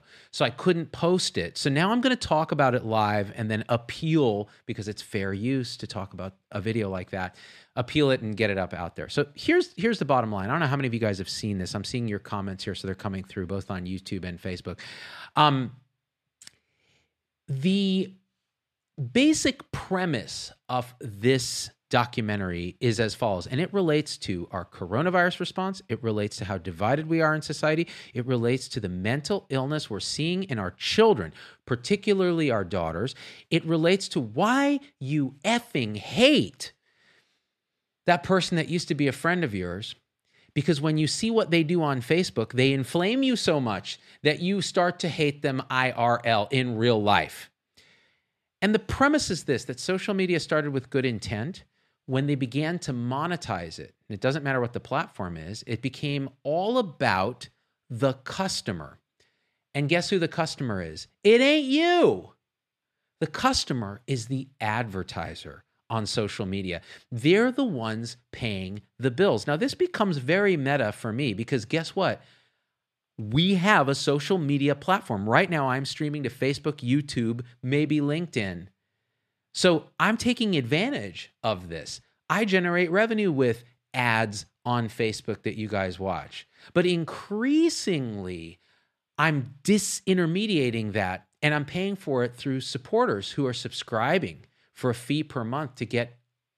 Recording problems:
none

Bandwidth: 14 kHz